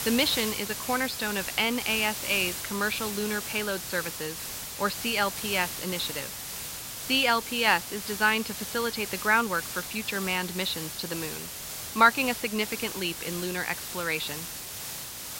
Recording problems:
high frequencies cut off; noticeable; nothing above 5.5 kHz
hiss; loud; throughout; 6 dB below the speech

